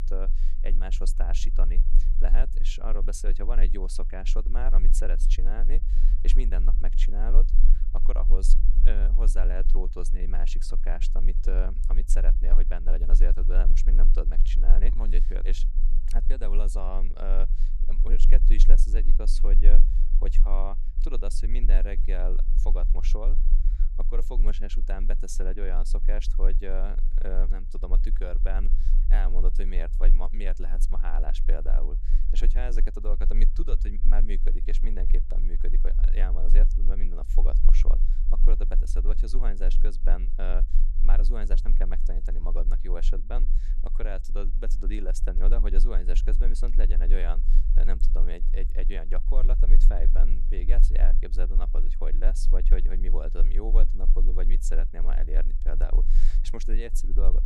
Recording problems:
low rumble; noticeable; throughout; 15 dB below the speech

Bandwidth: 15.5 kHz